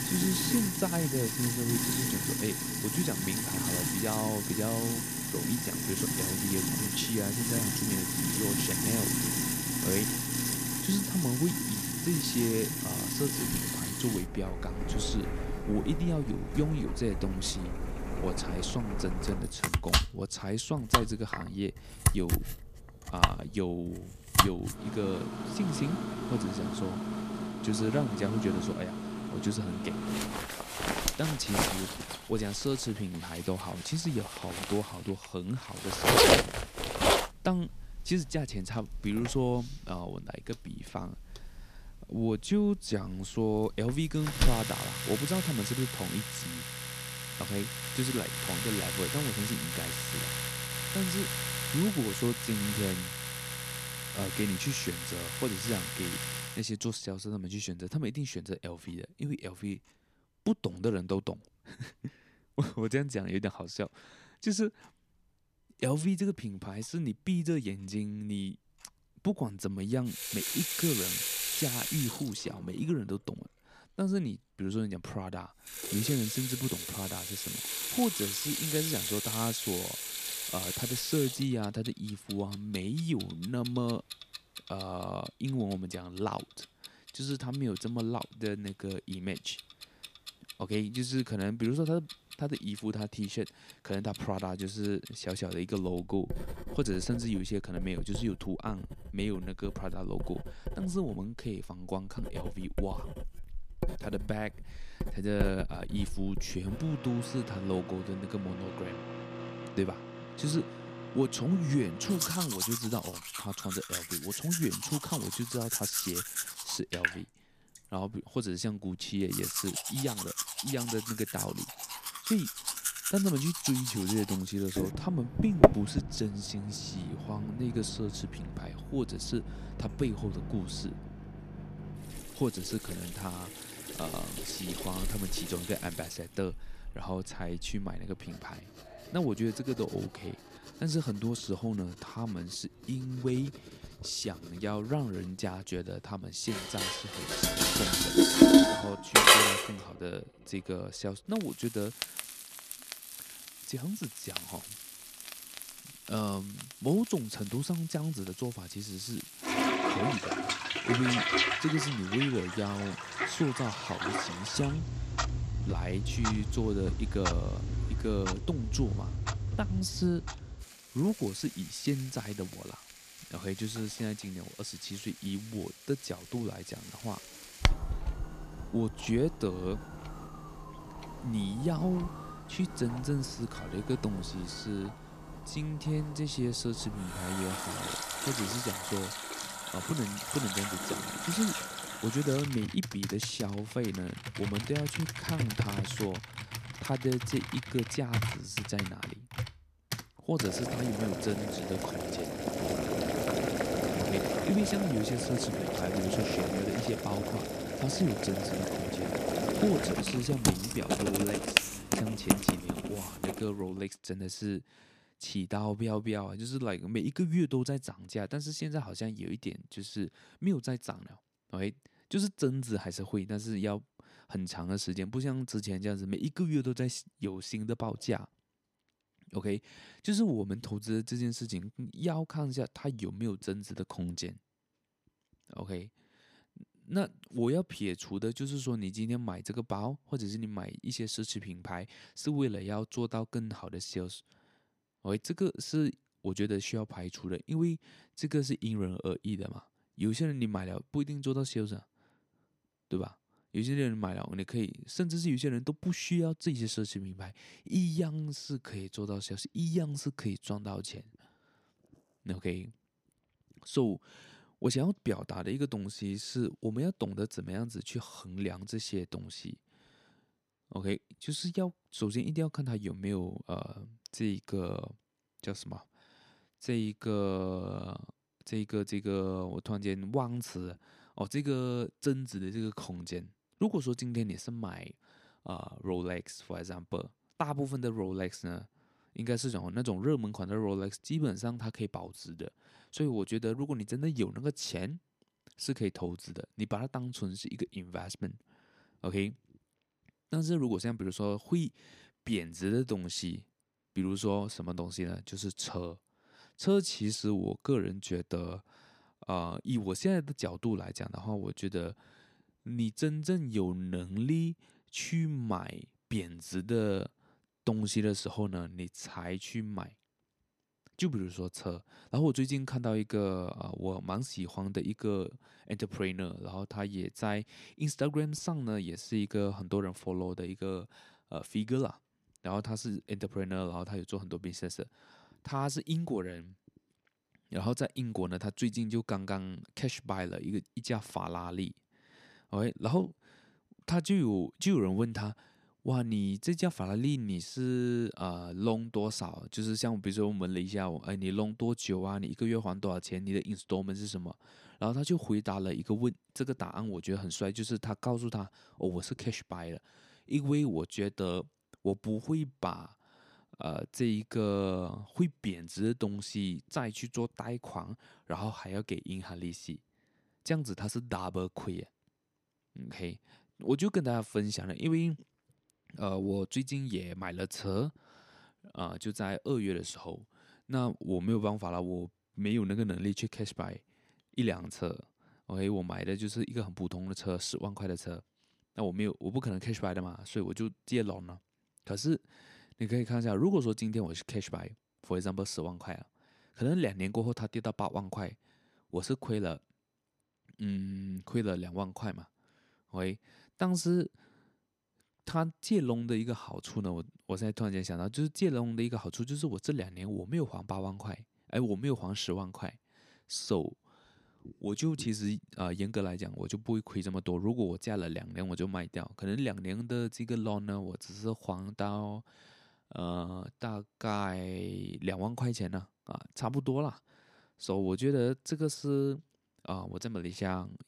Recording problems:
household noises; very loud; until 3:34; 2 dB above the speech
uneven, jittery; slightly; from 2:29 to 6:46

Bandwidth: 14.5 kHz